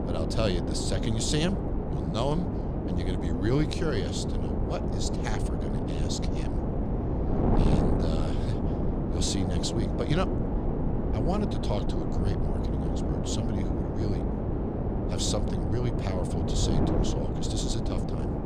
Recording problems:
wind noise on the microphone; heavy; as loud as the speech

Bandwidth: 15.5 kHz